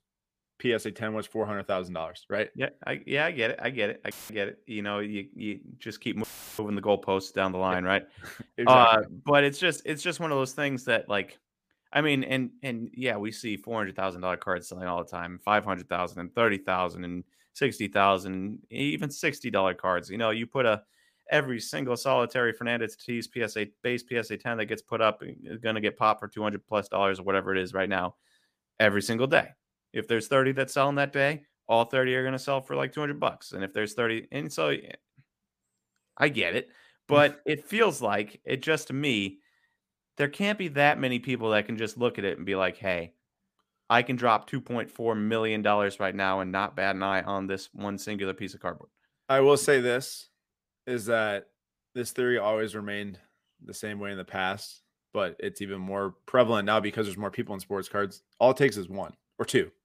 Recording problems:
audio cutting out; filled with static; at 4 s and at 6 s

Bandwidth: 15 kHz